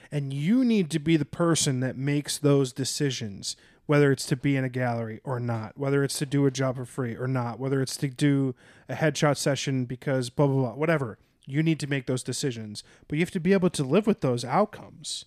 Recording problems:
none

